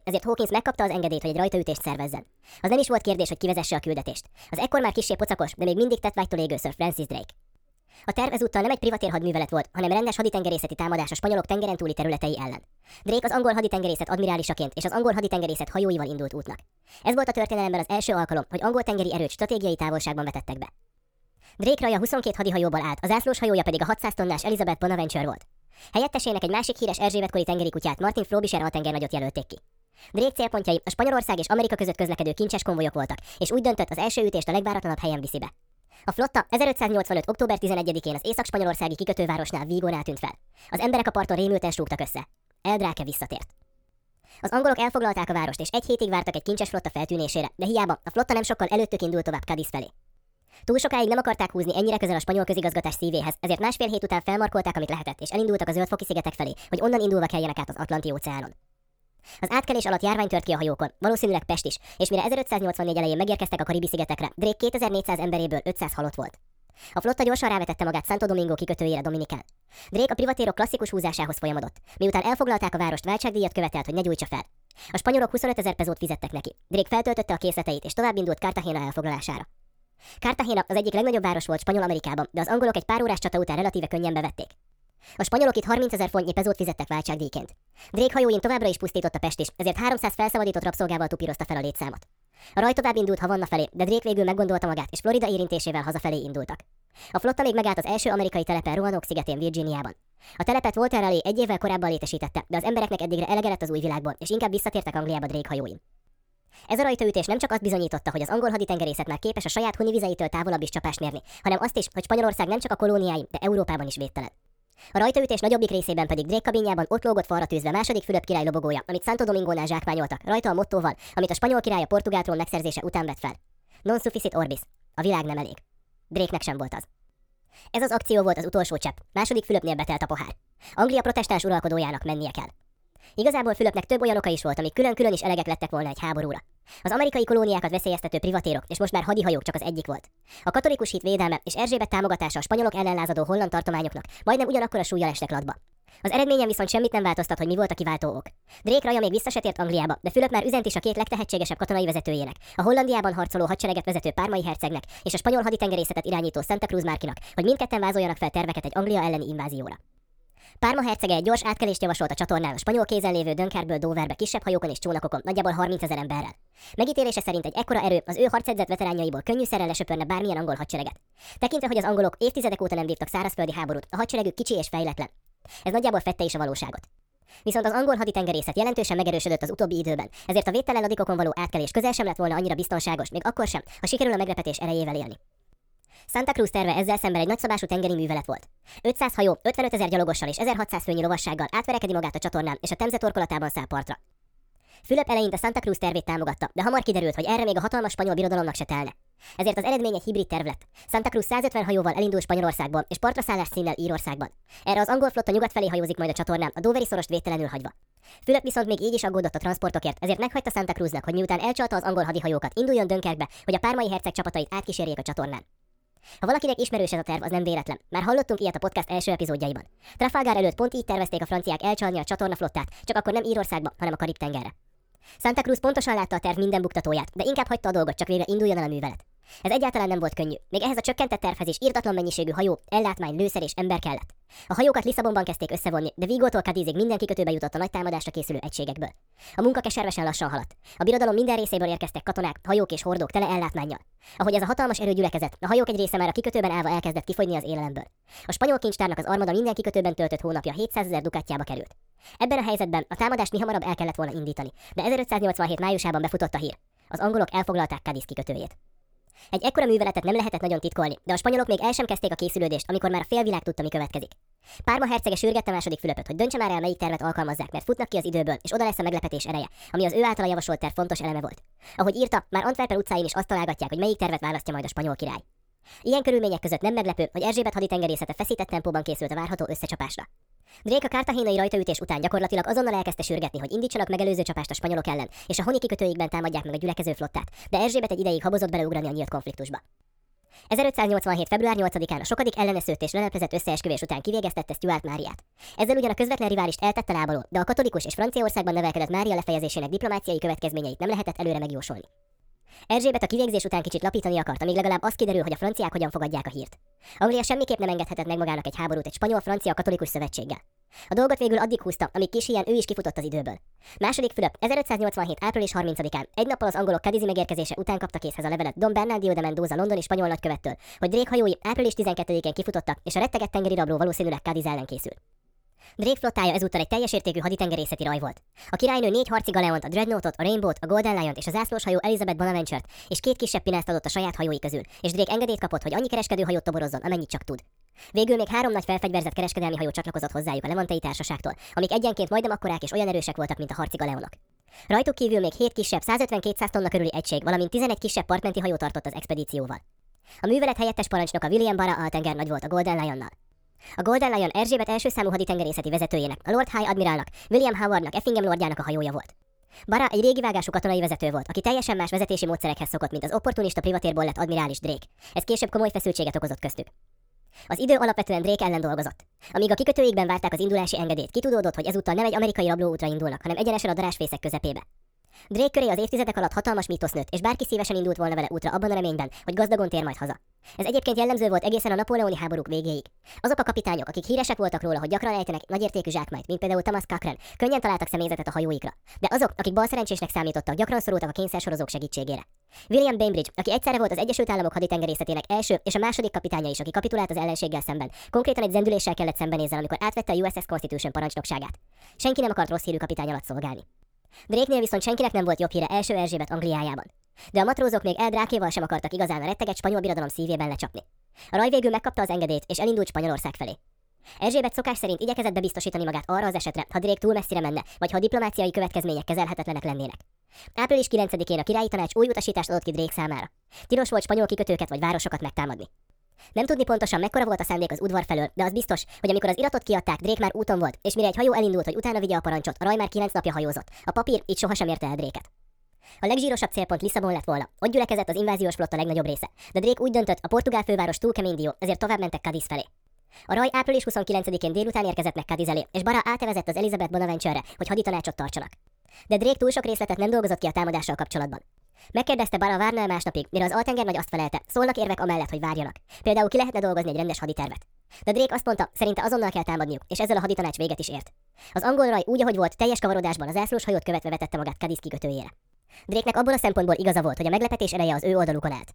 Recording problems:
wrong speed and pitch; too fast and too high; 1.5 times normal speed

